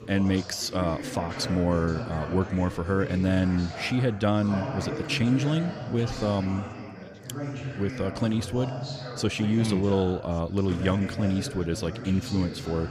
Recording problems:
background chatter; loud; throughout; 4 voices, 9 dB below the speech

